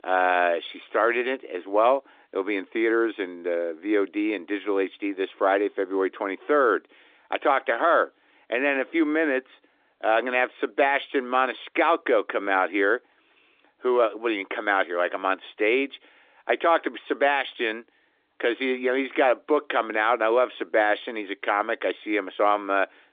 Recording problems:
phone-call audio

